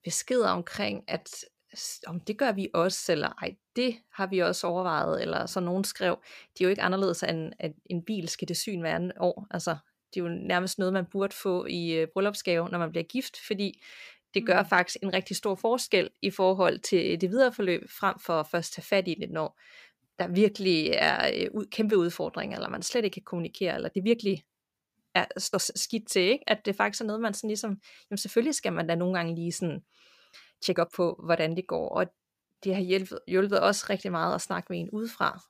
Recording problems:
uneven, jittery; strongly; from 0.5 to 34 s

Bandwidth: 15 kHz